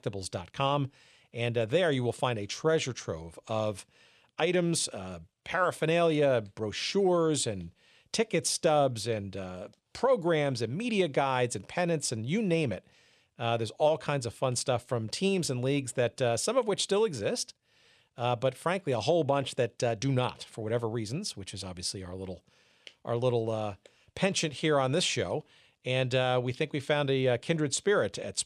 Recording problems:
none

